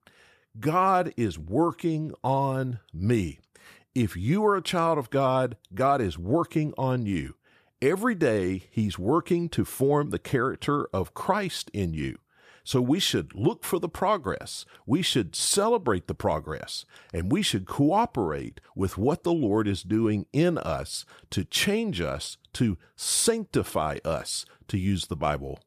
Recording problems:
none

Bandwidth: 14.5 kHz